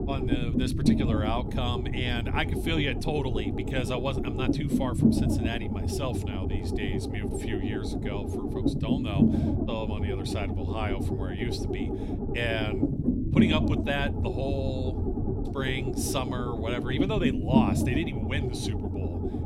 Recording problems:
low rumble; loud; throughout; 1 dB below the speech

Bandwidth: 16 kHz